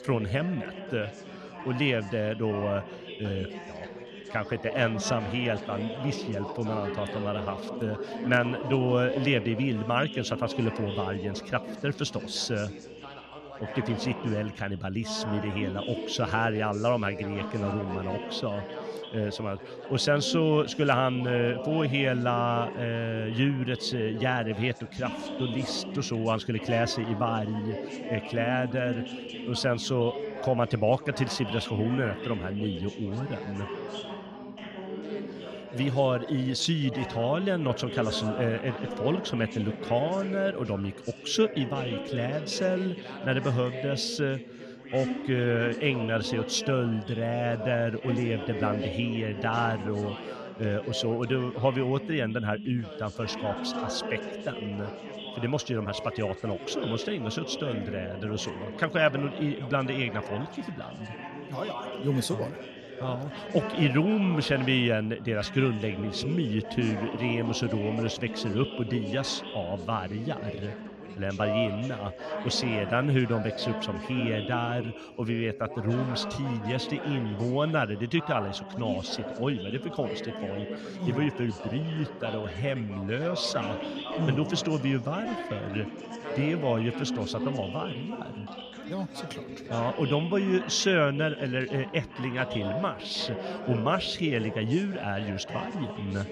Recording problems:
background chatter; loud; throughout; 3 voices, 8 dB below the speech

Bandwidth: 15.5 kHz